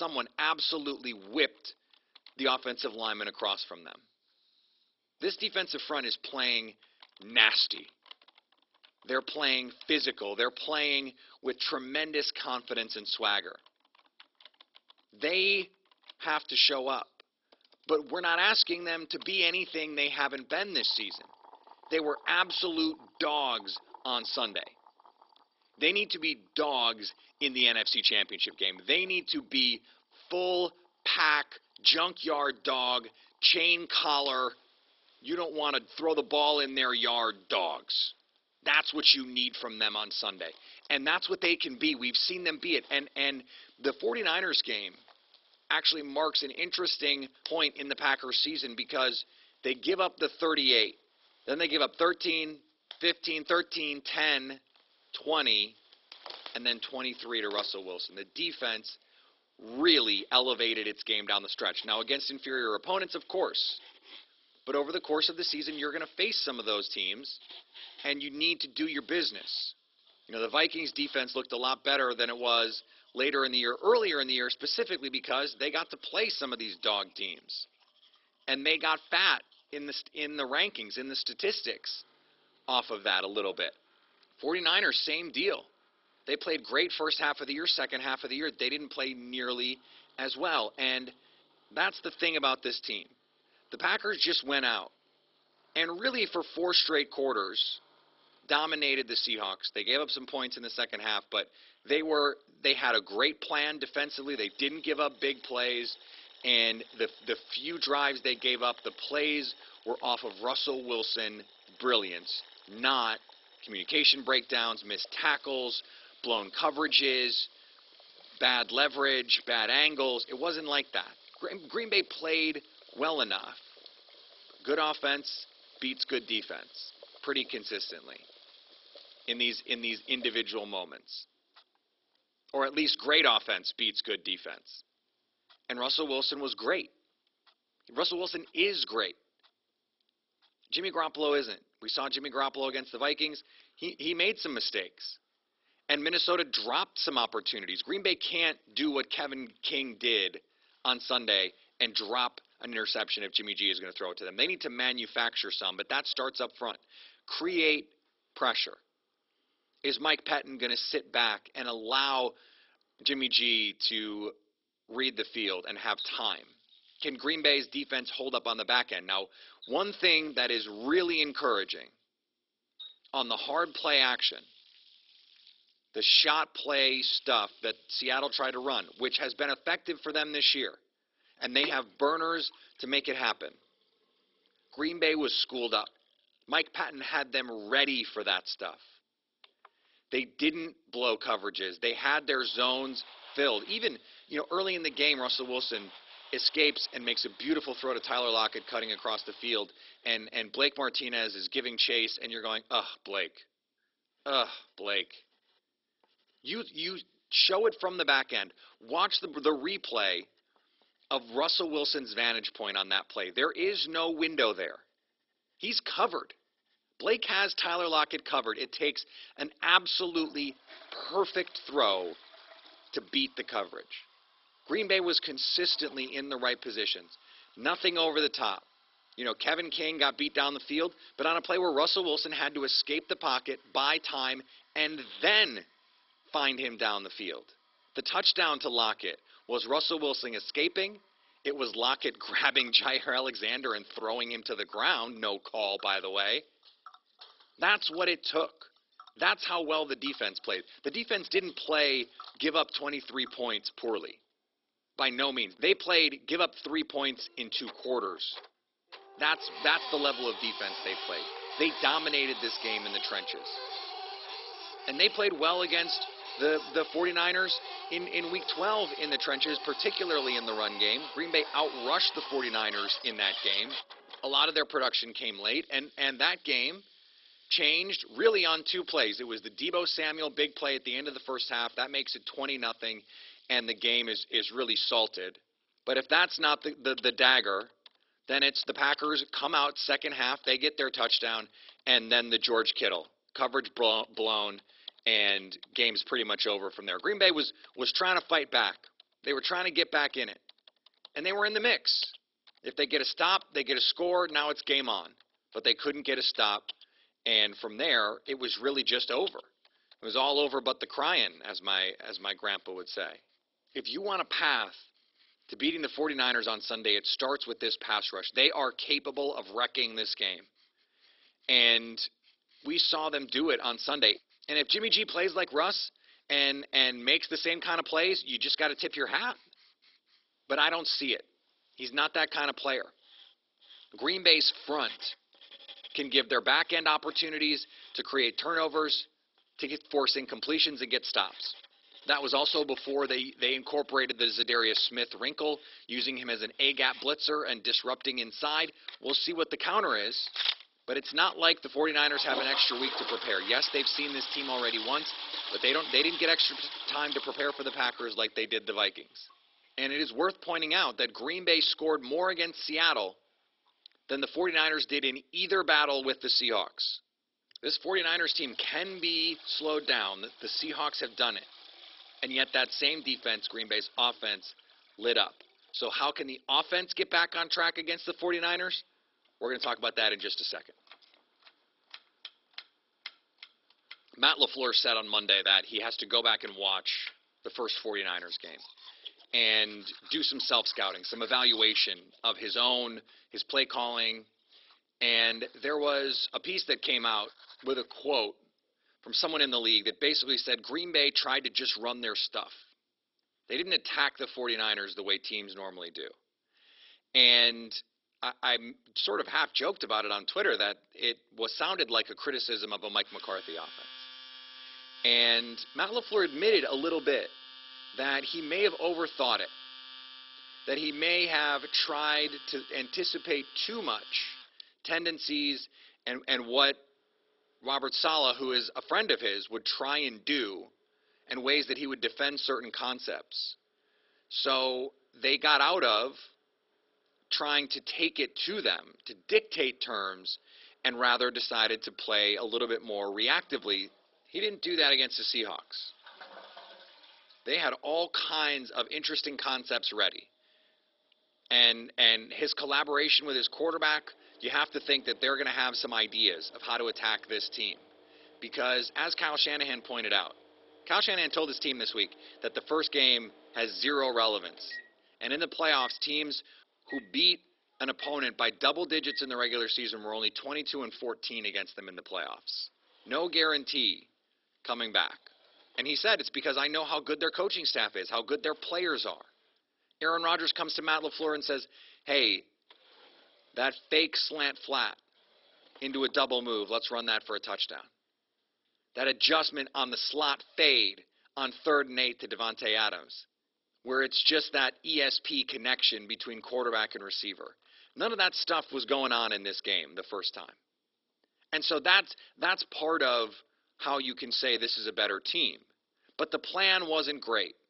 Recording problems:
garbled, watery; badly; nothing above 5.5 kHz
thin; very; fading below 350 Hz
household noises; noticeable; throughout; 15 dB below the speech
abrupt cut into speech; at the start

